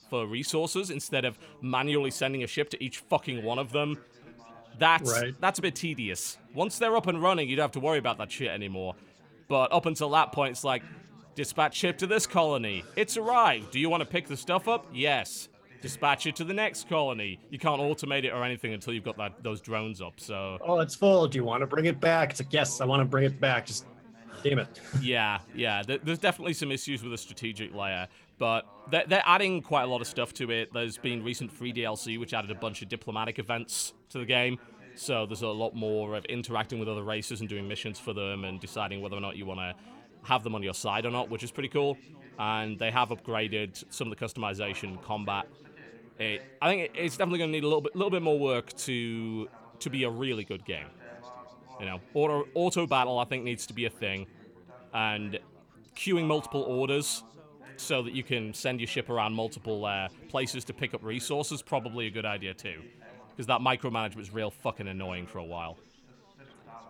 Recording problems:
background chatter; faint; throughout; 4 voices, 25 dB below the speech

